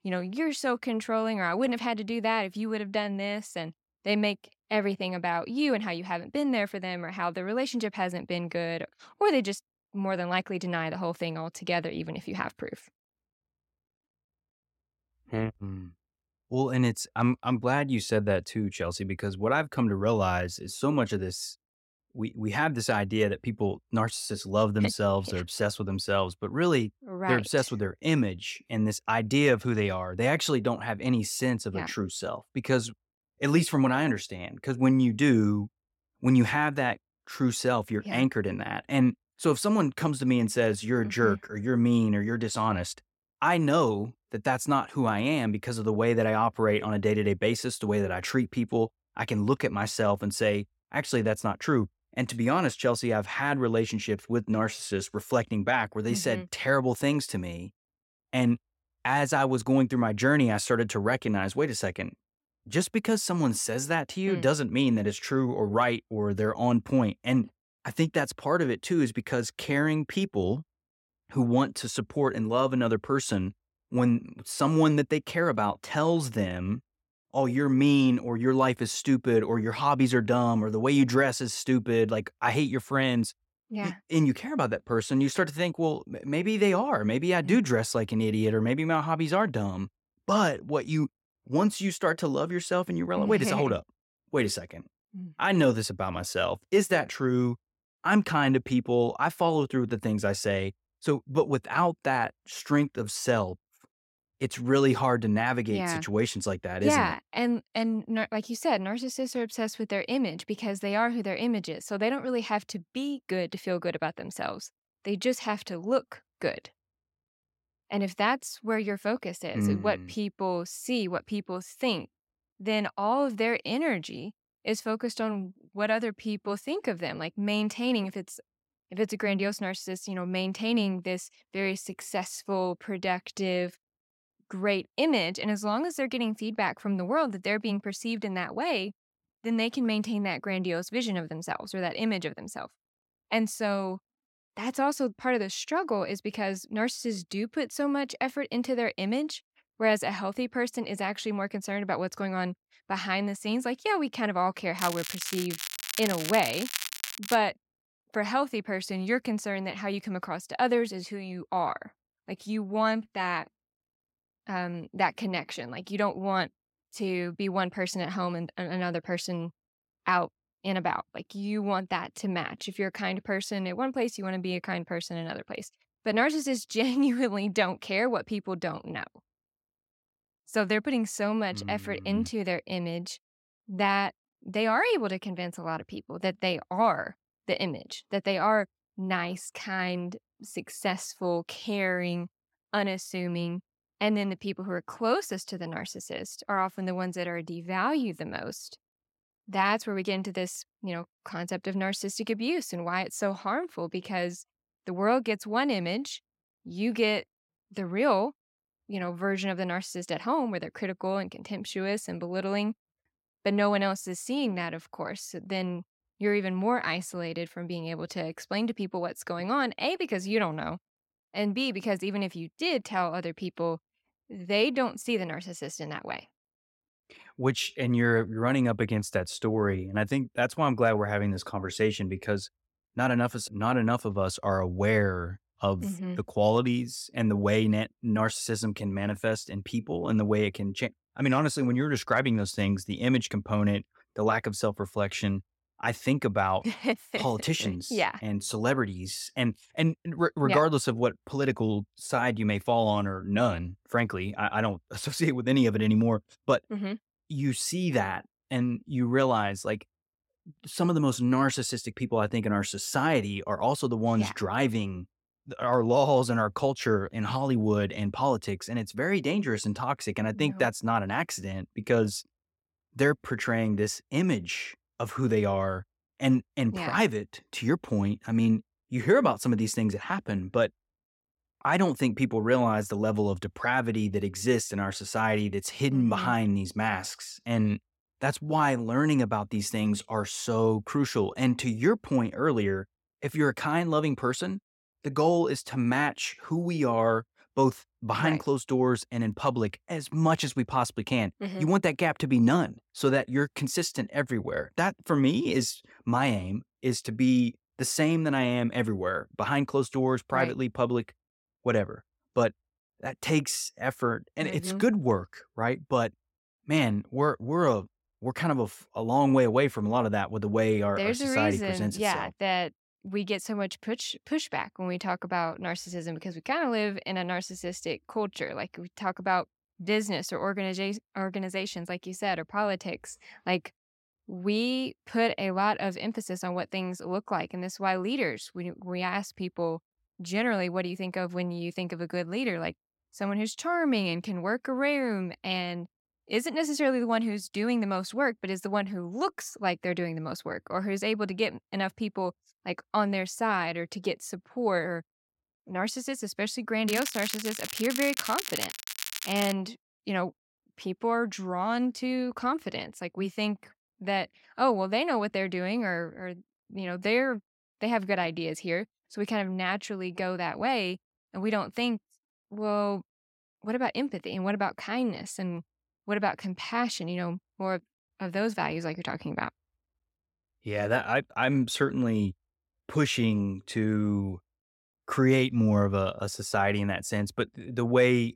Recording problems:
crackling; loud; from 2:35 to 2:37 and from 5:57 to 6:00; 6 dB below the speech

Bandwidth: 16.5 kHz